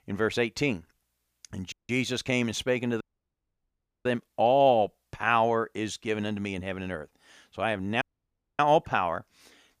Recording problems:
audio cutting out; at 1.5 s, at 3 s for 1 s and at 8 s for 0.5 s

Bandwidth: 15 kHz